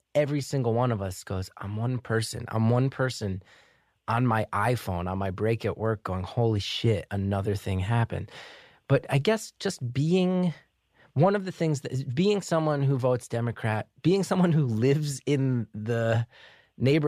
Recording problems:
abrupt cut into speech; at the end

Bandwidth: 14.5 kHz